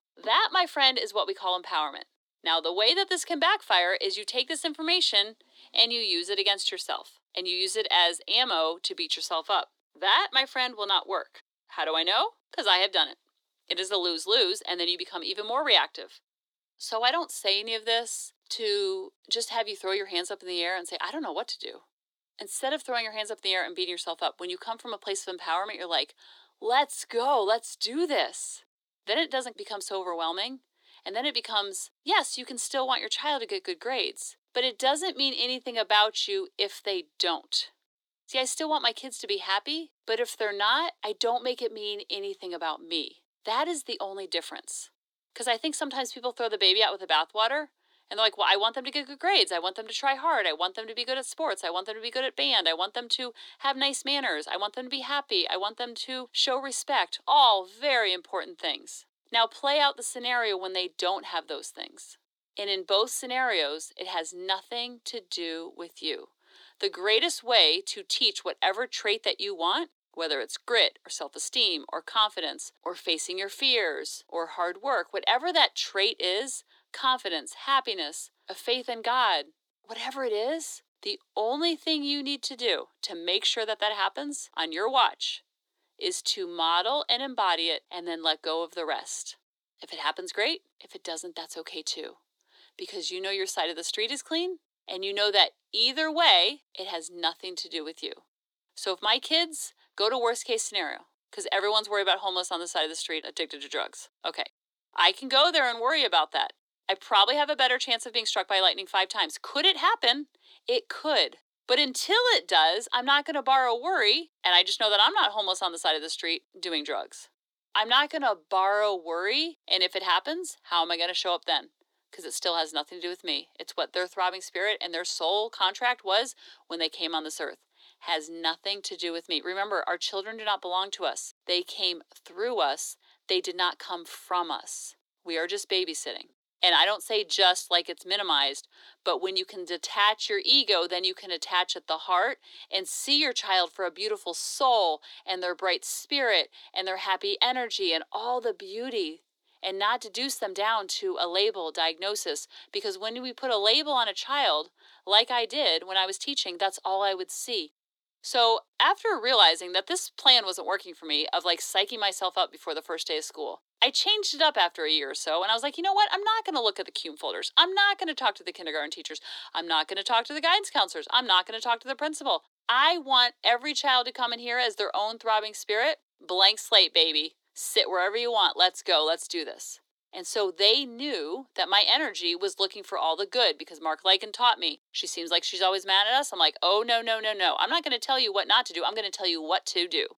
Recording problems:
thin; somewhat; fading below 300 Hz

